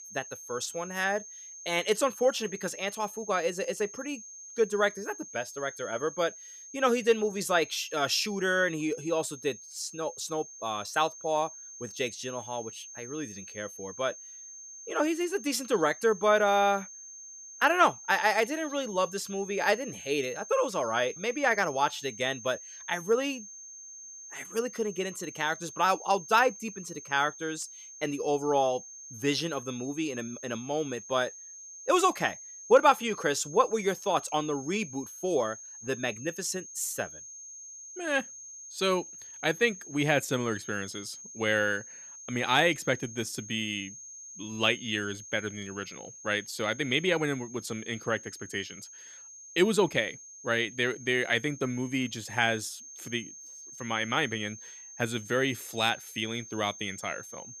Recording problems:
high-pitched whine; noticeable; throughout; 6.5 kHz, 15 dB below the speech

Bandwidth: 14.5 kHz